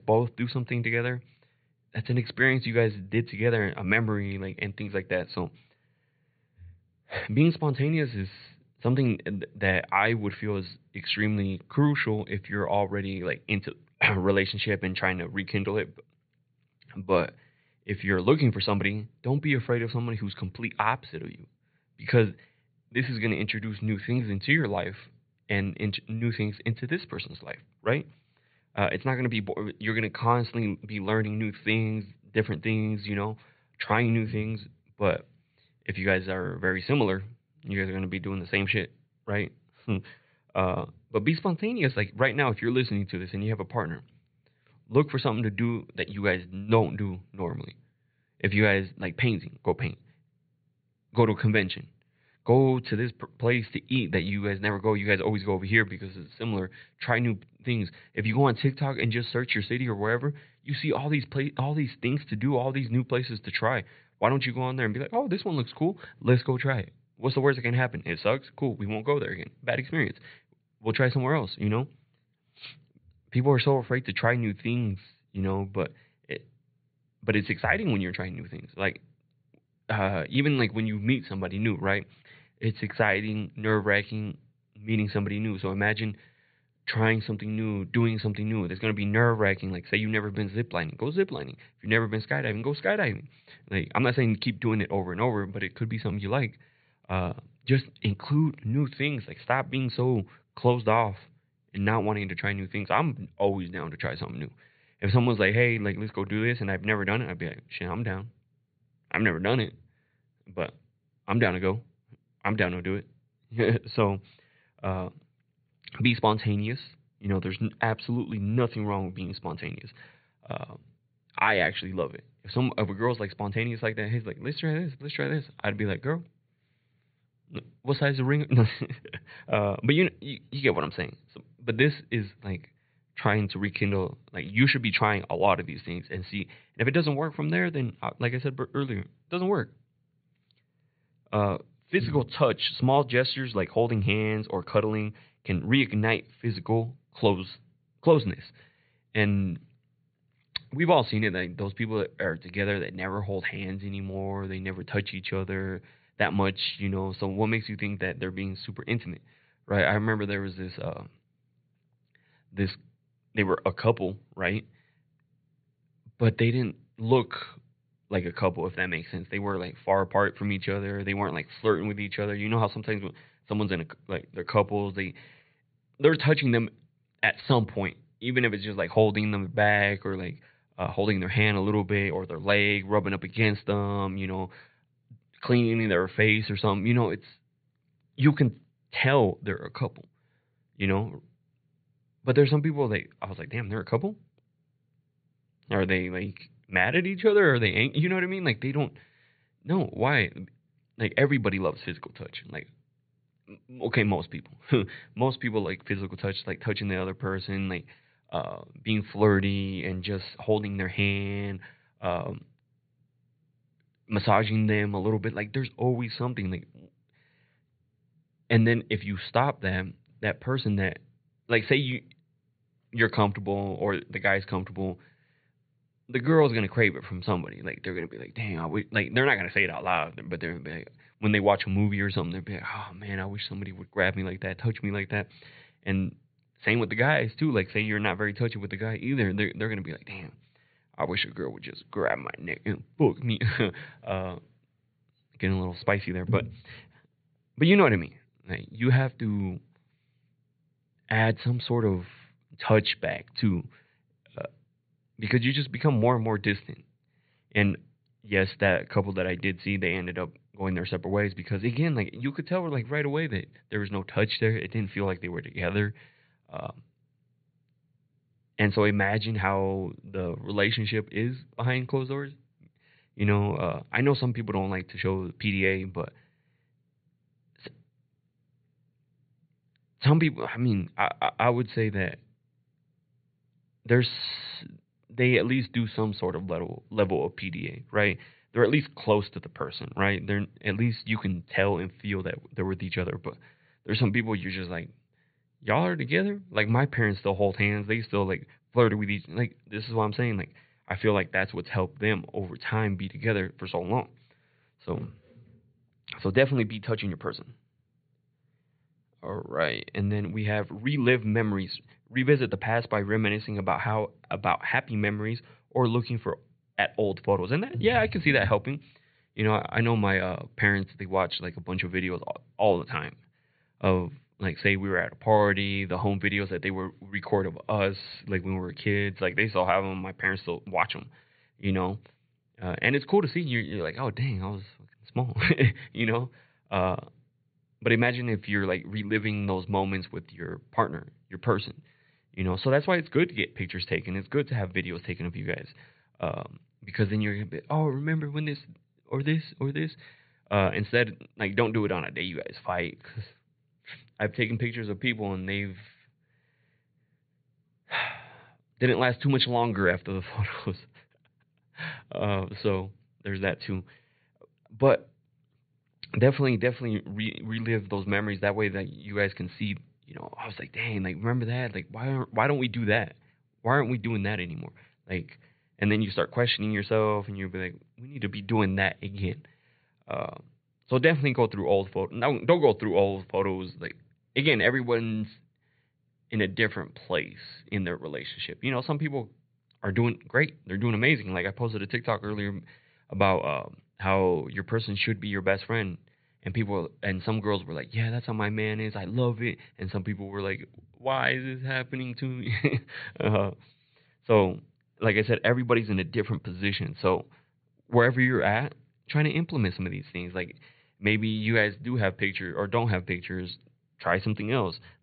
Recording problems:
high frequencies cut off; severe; nothing above 4.5 kHz

